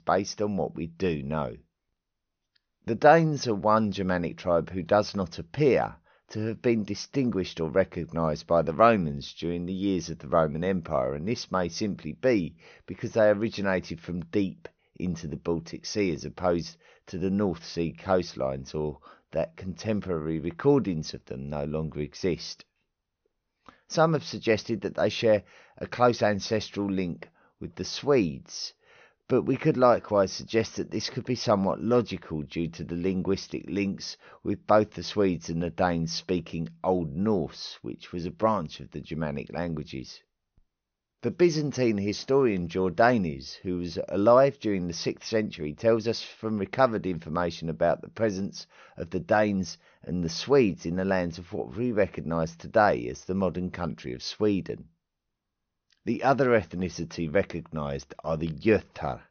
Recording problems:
high frequencies cut off; noticeable; nothing above 6.5 kHz

